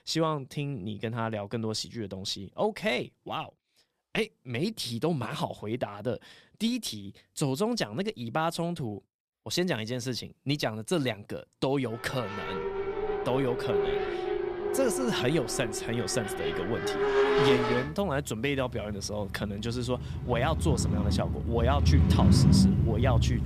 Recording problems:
traffic noise; very loud; from 12 s on; 4 dB above the speech

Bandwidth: 14.5 kHz